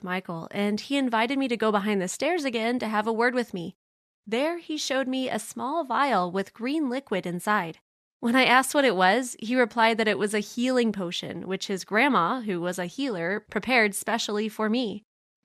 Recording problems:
none

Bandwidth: 14.5 kHz